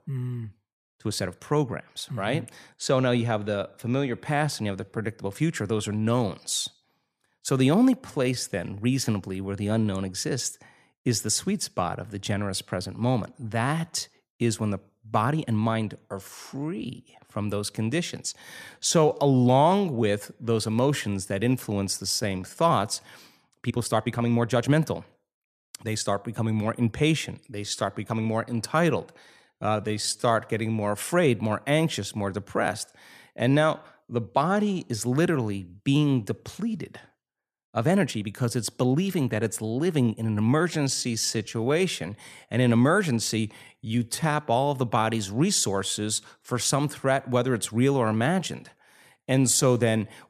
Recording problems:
uneven, jittery; strongly; from 1 to 50 s

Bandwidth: 14.5 kHz